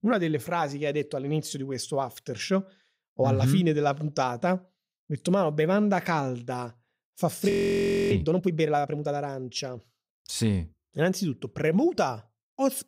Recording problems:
audio freezing; at 7.5 s for 0.5 s

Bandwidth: 15.5 kHz